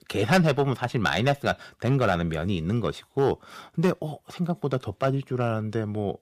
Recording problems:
distortion; slight; 1.8% of the sound clipped

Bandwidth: 15 kHz